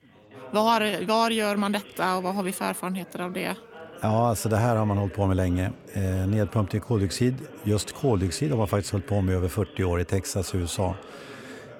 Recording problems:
background chatter; noticeable; throughout; 3 voices, 20 dB below the speech

